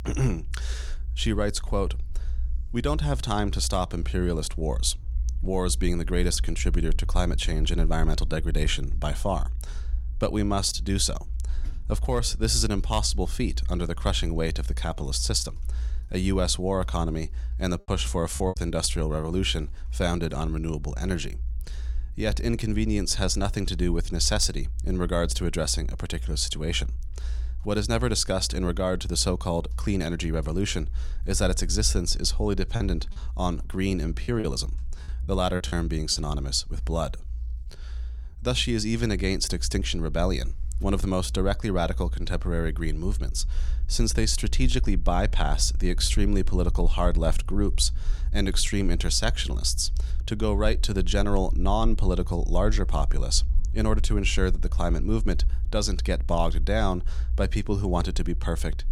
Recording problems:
low rumble; faint; throughout; 25 dB below the speech
choppy; very; at 18 s and from 33 to 36 s; 10% of the speech affected

